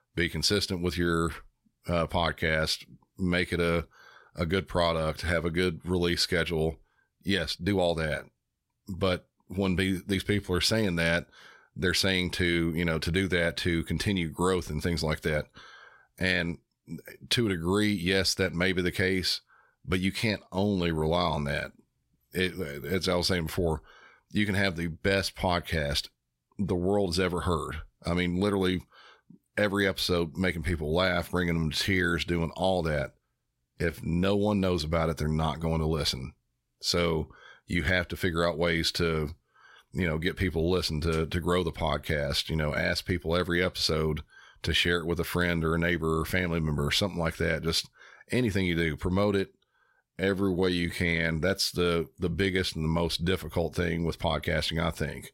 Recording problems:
uneven, jittery; strongly; from 7.5 to 51 s

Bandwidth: 16 kHz